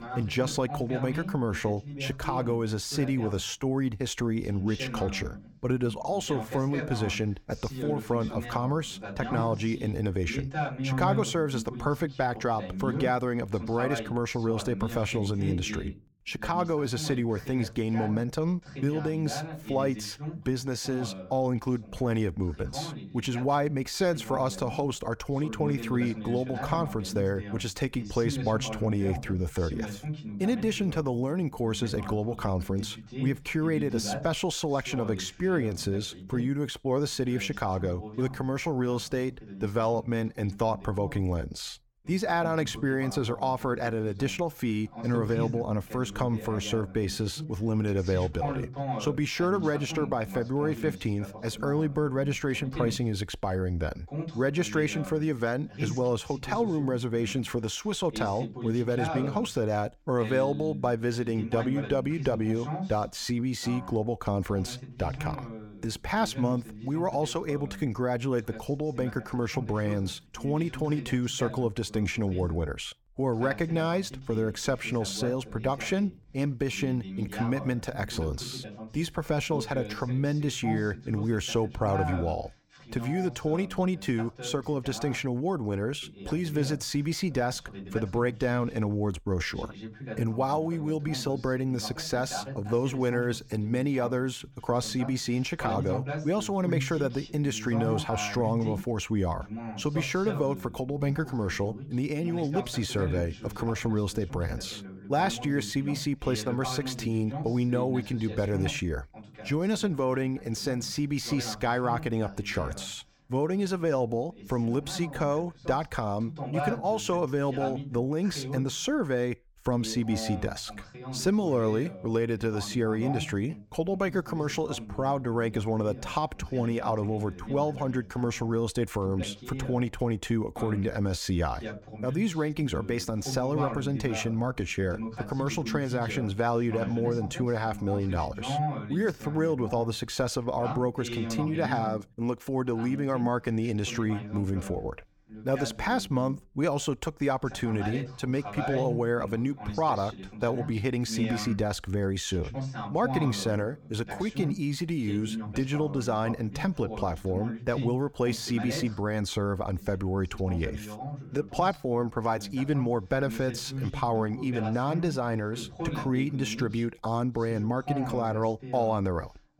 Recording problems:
voice in the background; loud; throughout; 9 dB below the speech

